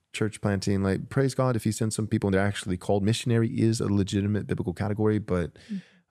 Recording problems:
uneven, jittery; strongly; from 0.5 to 5.5 s

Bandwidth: 14.5 kHz